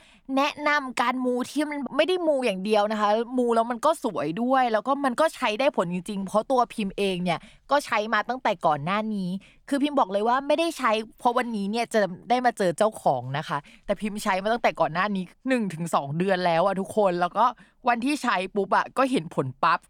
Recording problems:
none

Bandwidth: 18.5 kHz